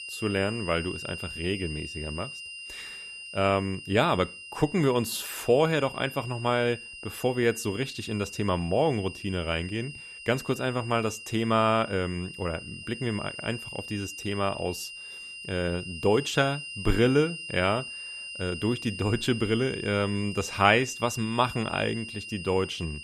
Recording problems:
high-pitched whine; noticeable; throughout; 3 kHz, 10 dB below the speech

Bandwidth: 14.5 kHz